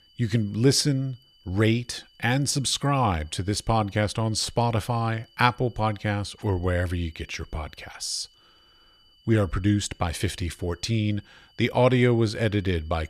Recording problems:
high-pitched whine; faint; throughout; 3 kHz, 30 dB below the speech

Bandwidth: 14.5 kHz